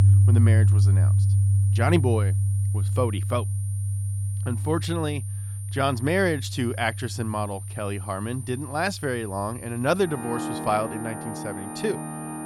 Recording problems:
background music; very loud; throughout; 3 dB above the speech
high-pitched whine; noticeable; throughout; 9 kHz, 15 dB below the speech

